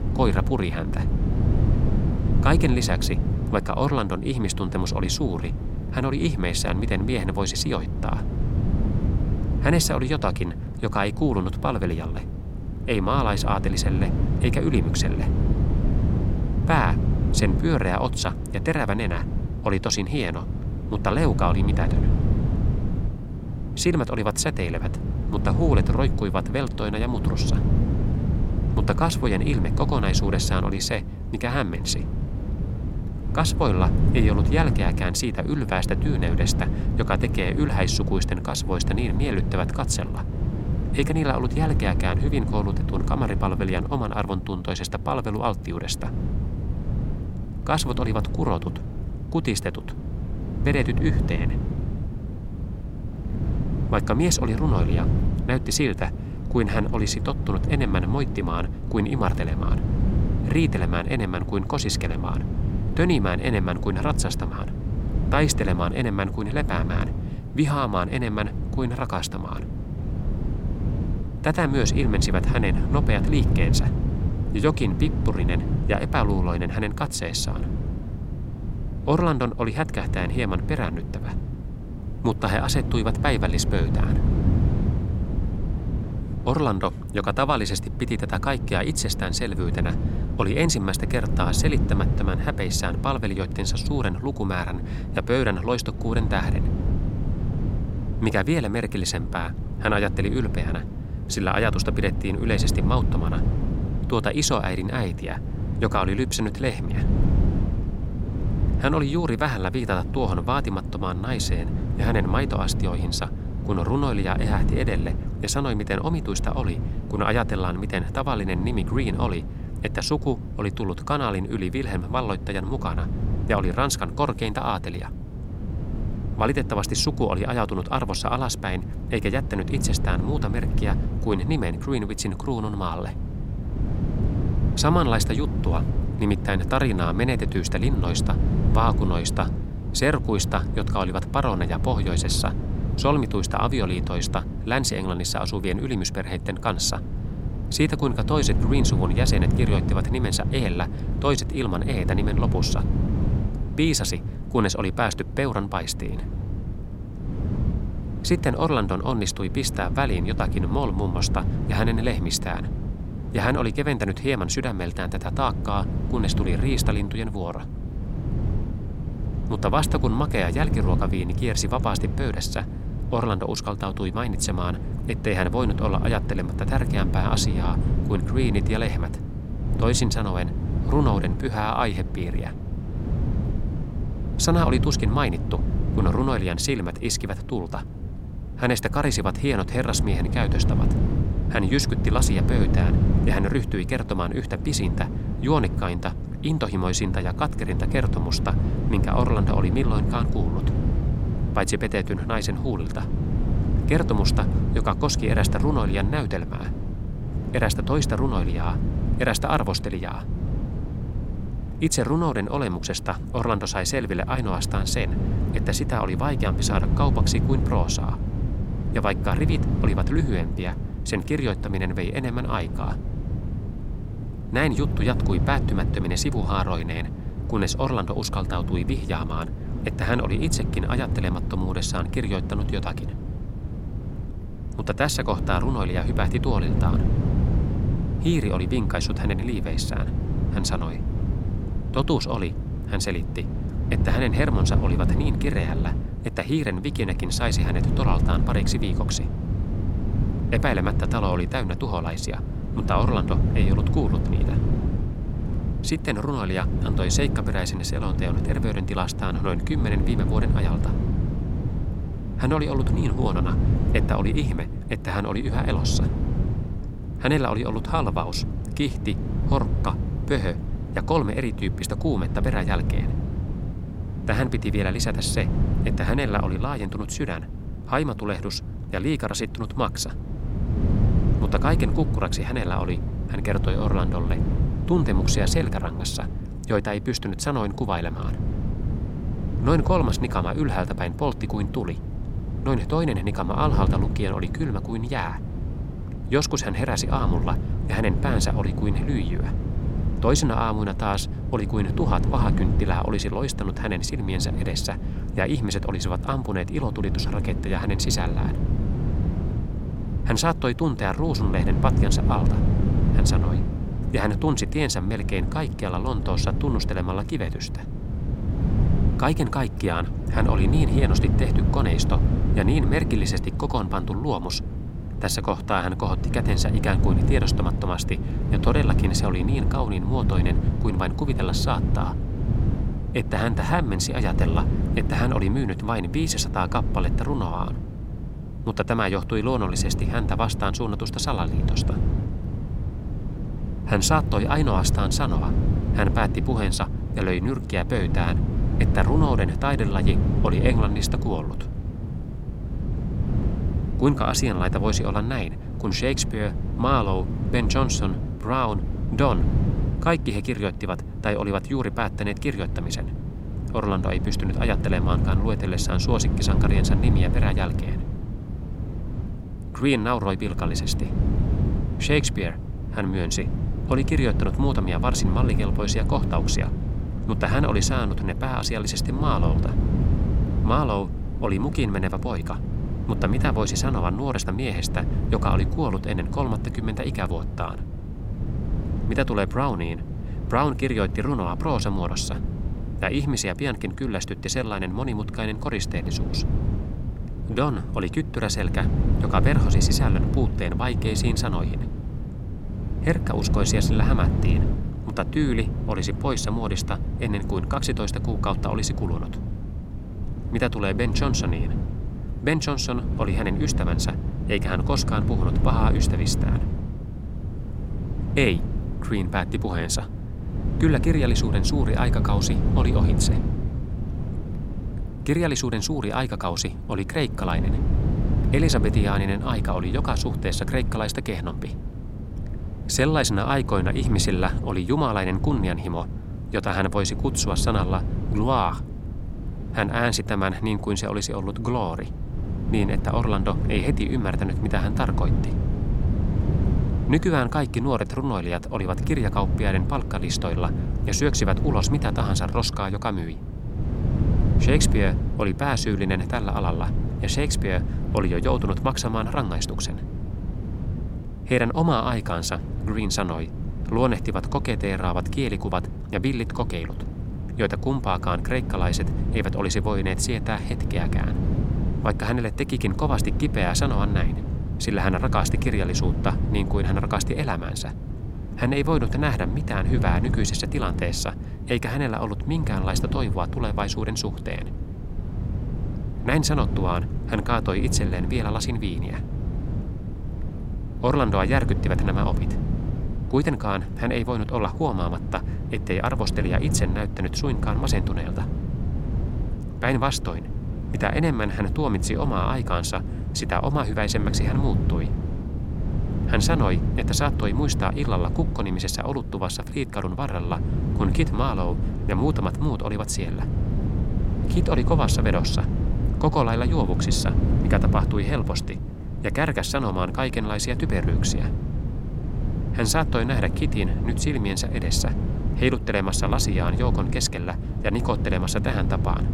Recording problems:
wind noise on the microphone; heavy; 10 dB below the speech

